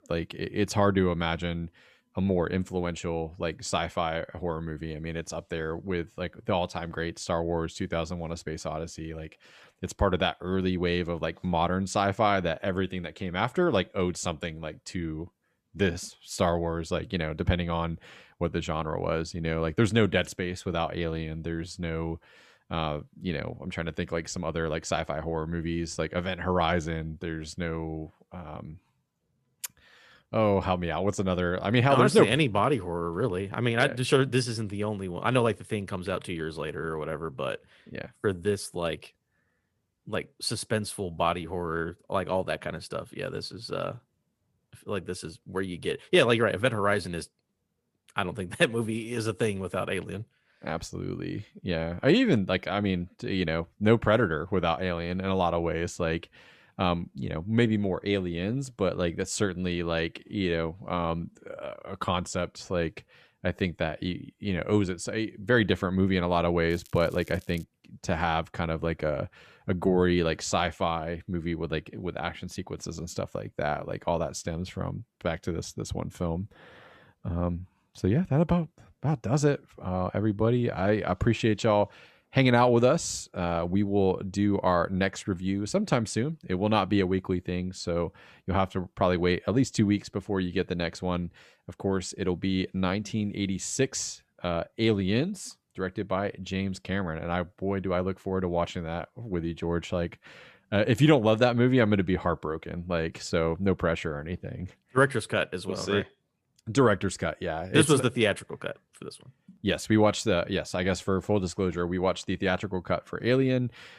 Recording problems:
crackling; faint; at 1:07; 25 dB below the speech

